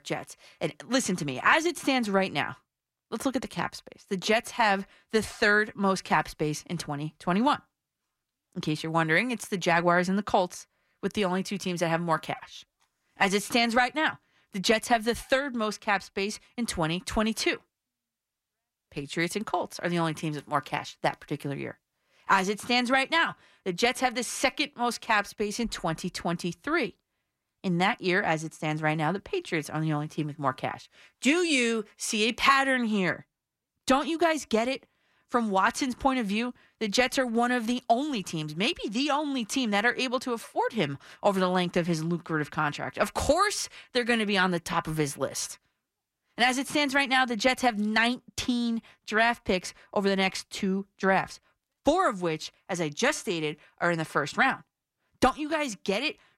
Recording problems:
none

